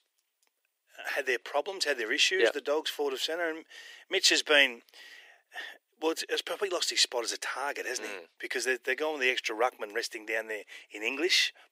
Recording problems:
thin; very; fading below 350 Hz

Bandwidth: 15.5 kHz